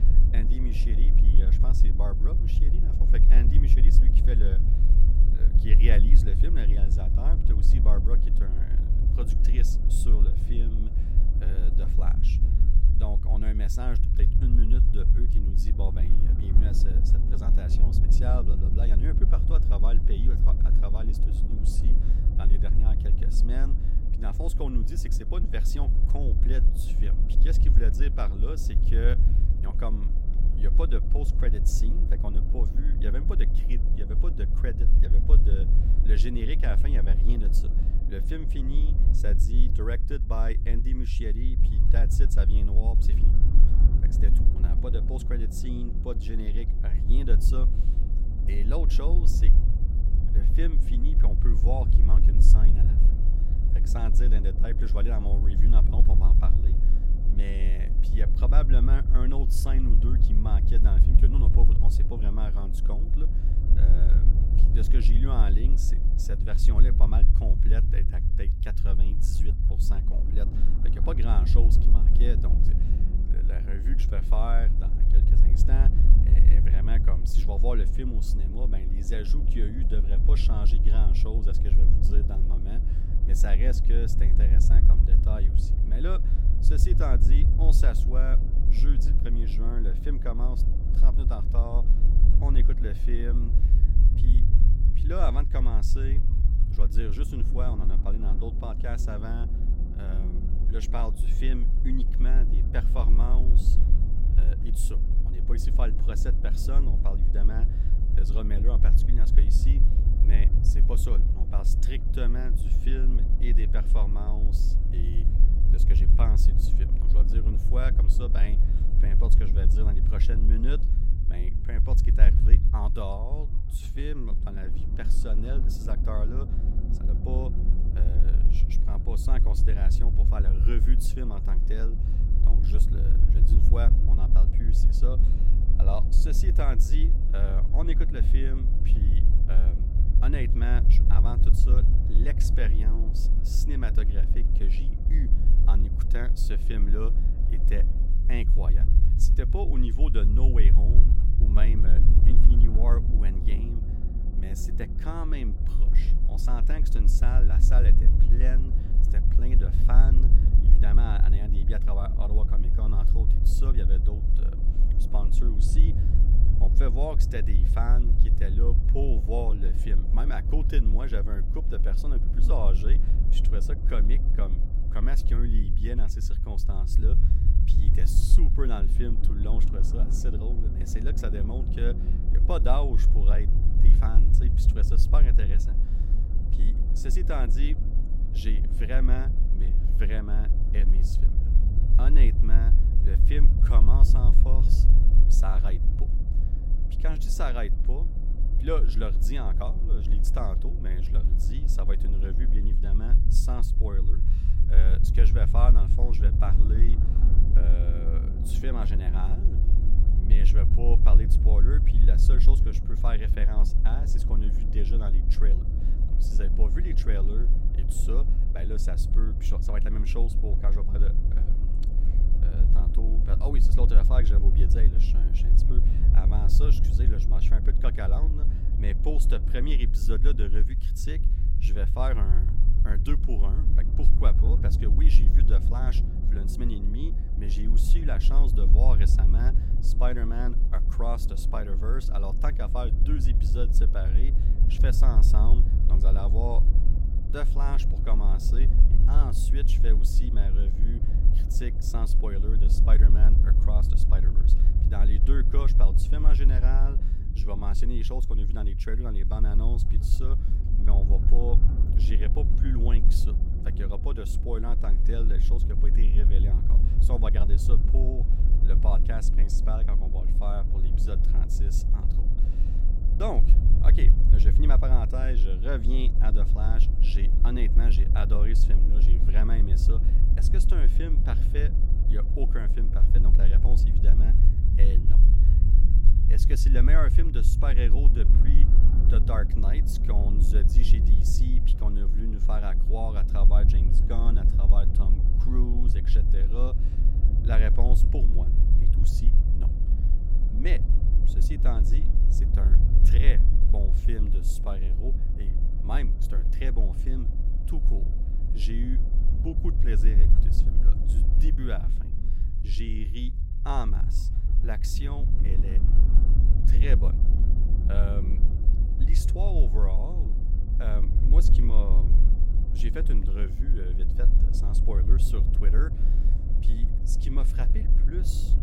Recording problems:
low rumble; loud; throughout; 5 dB below the speech

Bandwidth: 16.5 kHz